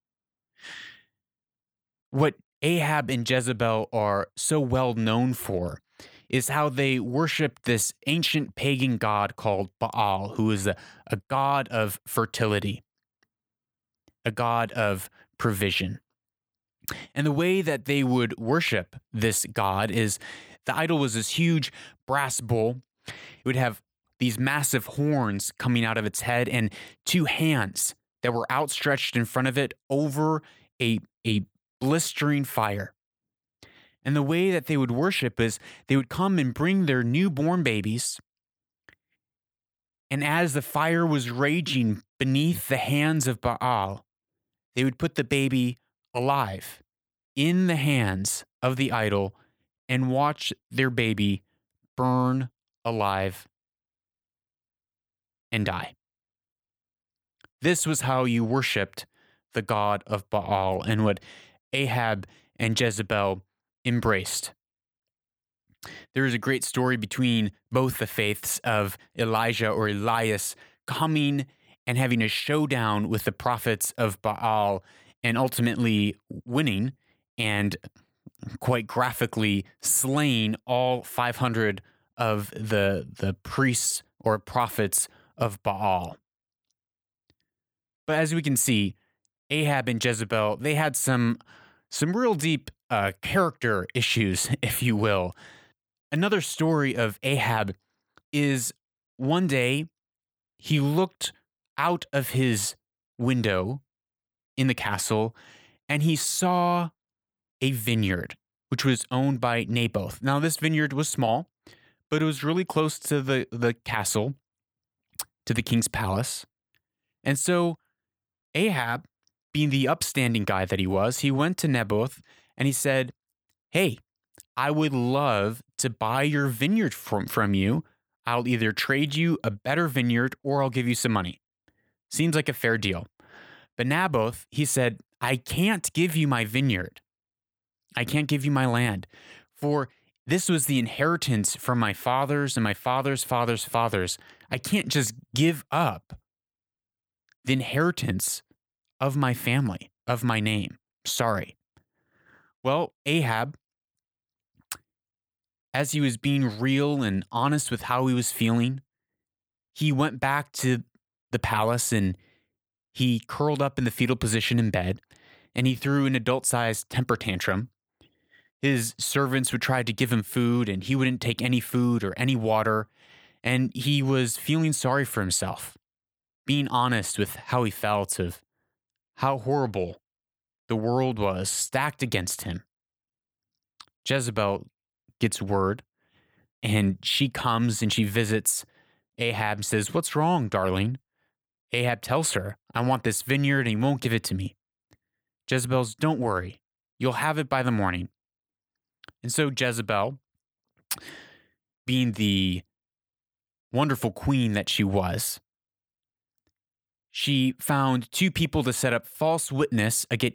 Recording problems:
none

